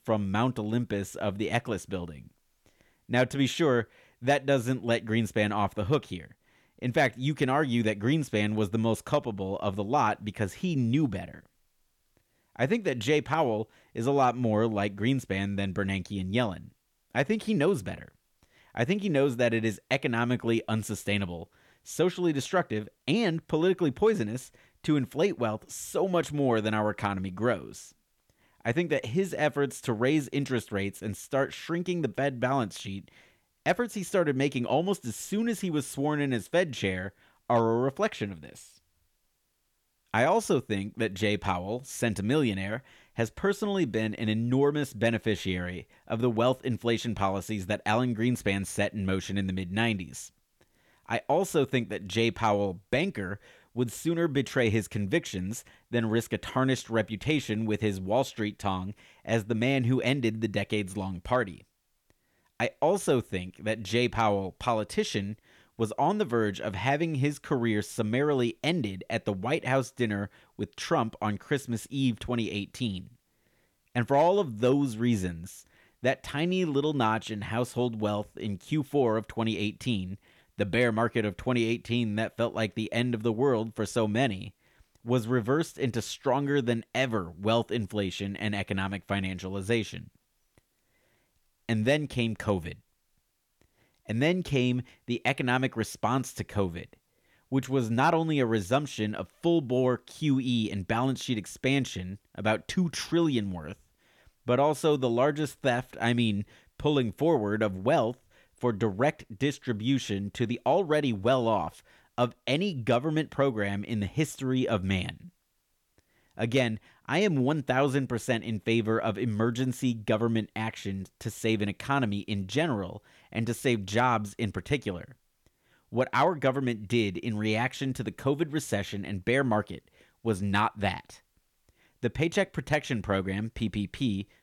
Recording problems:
none

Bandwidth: 18.5 kHz